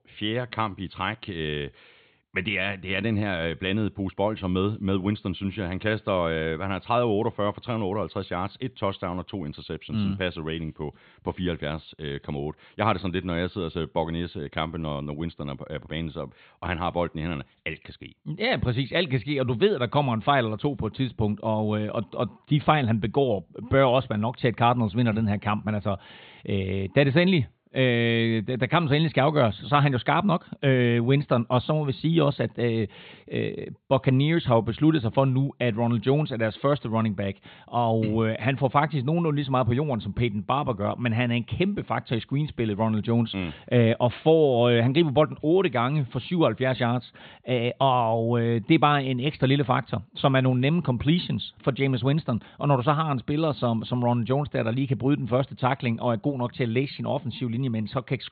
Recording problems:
high frequencies cut off; severe; nothing above 4 kHz

